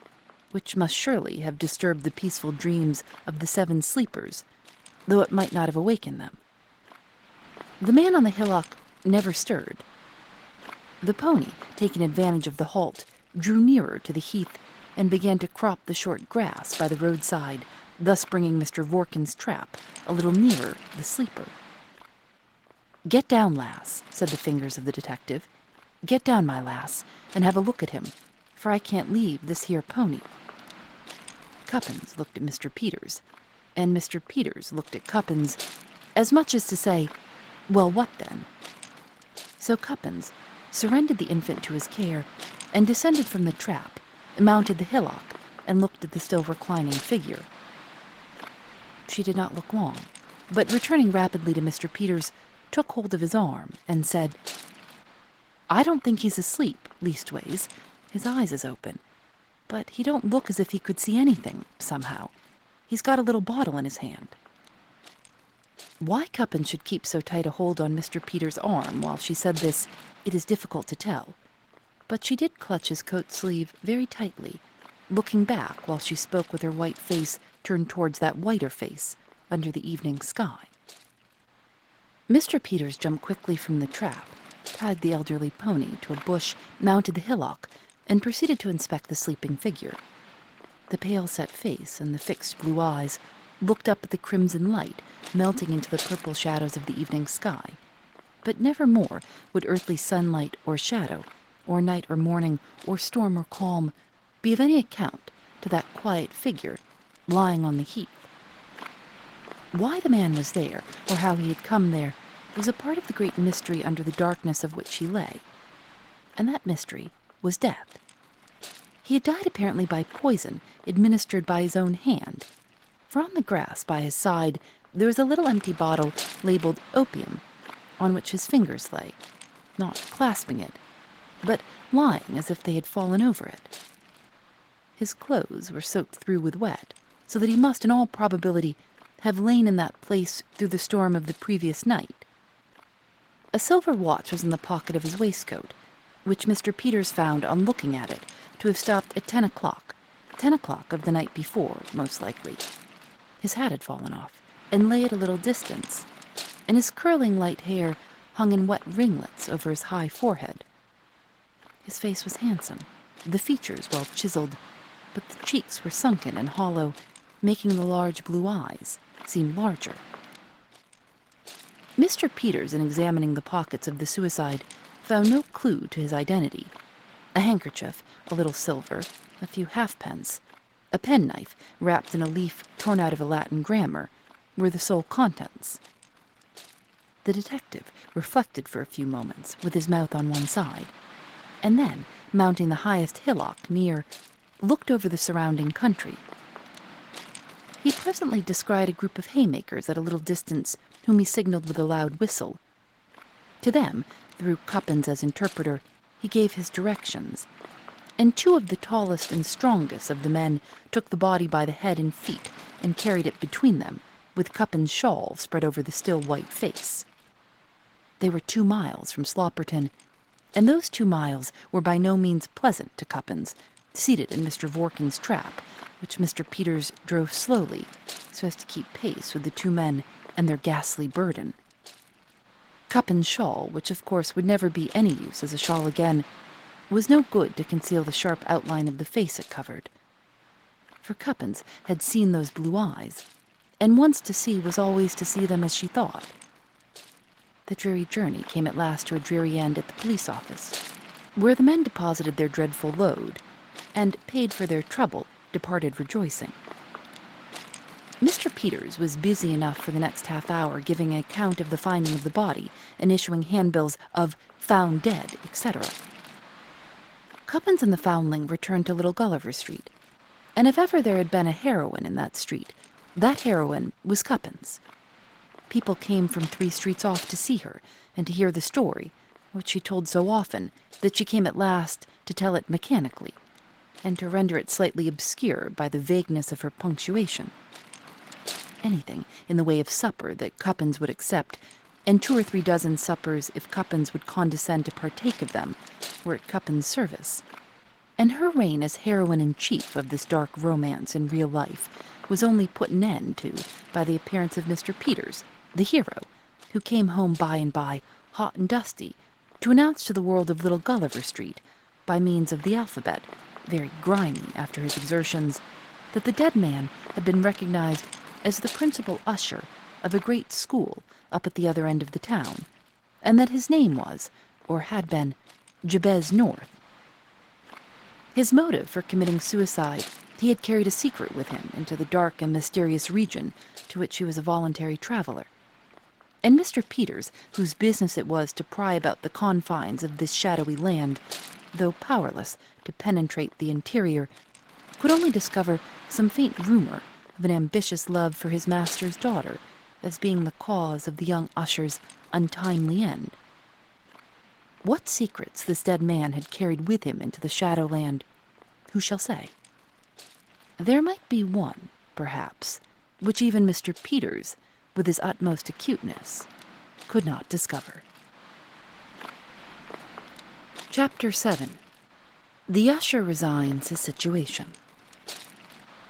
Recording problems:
garbled, watery; slightly; nothing above 16.5 kHz
wind noise on the microphone; occasional gusts; 15 dB below the speech

